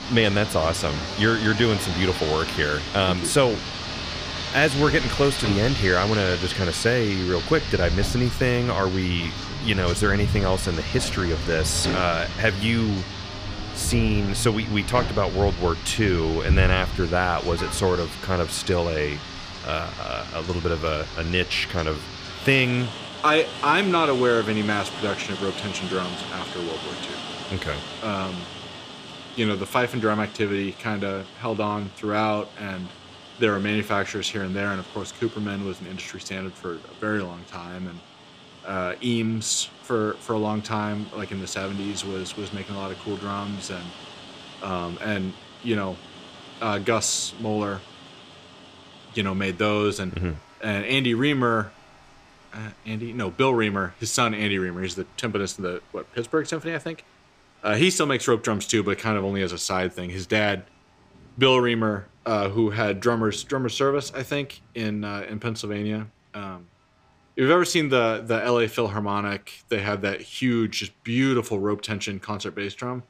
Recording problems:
rain or running water; loud; throughout; 7 dB below the speech

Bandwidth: 15 kHz